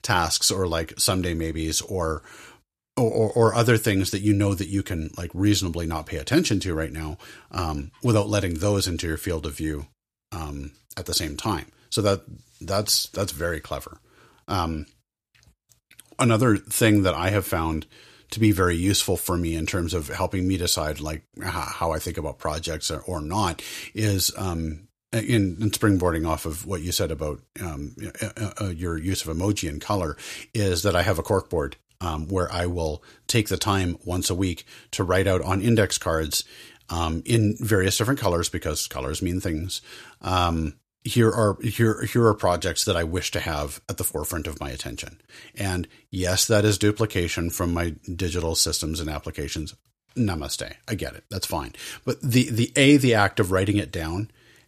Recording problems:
none

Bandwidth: 14.5 kHz